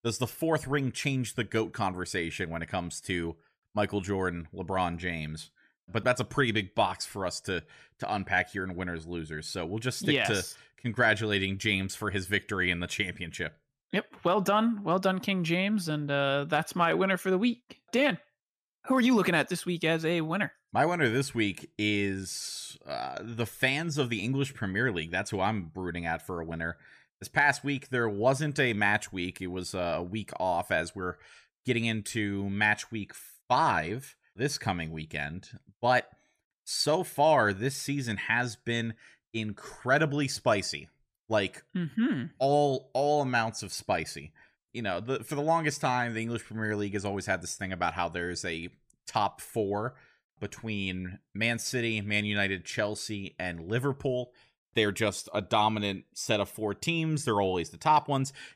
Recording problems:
none

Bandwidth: 14.5 kHz